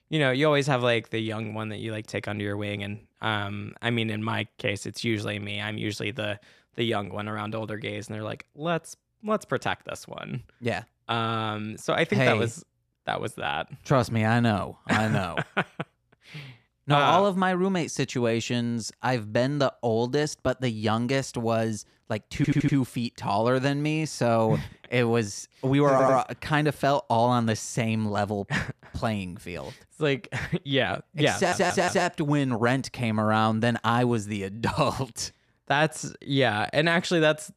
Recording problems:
audio stuttering; at 22 s, at 26 s and at 31 s

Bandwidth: 14 kHz